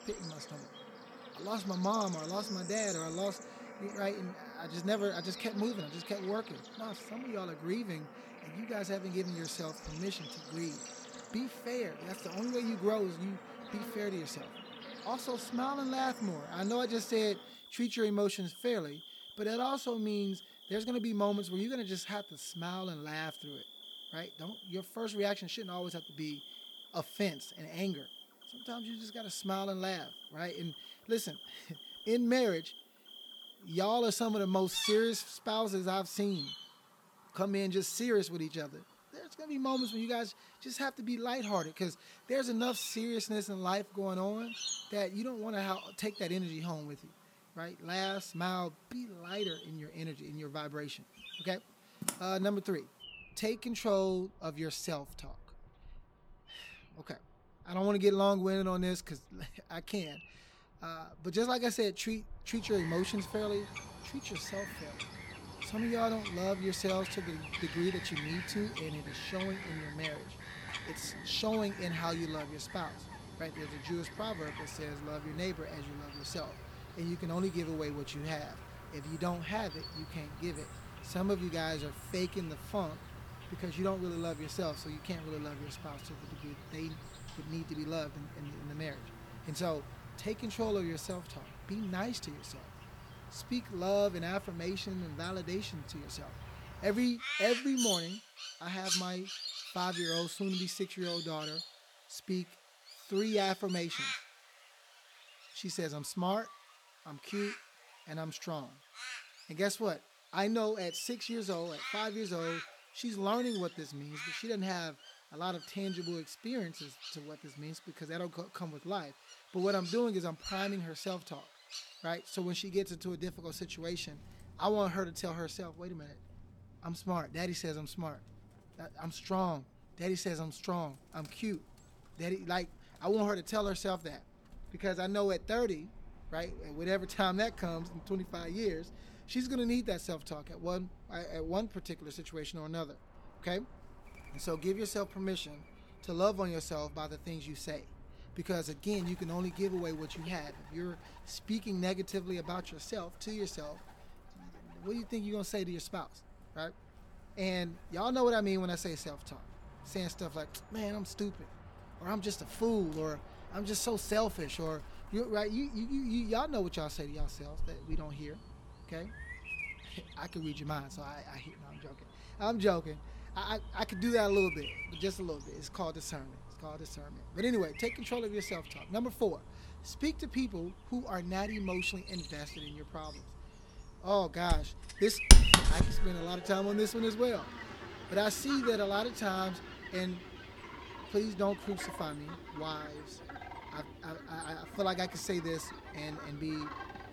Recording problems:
animal sounds; loud; throughout; 5 dB below the speech

